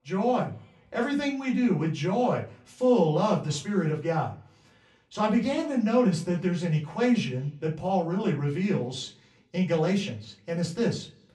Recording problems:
off-mic speech; far
room echo; very slight; dies away in 0.3 s

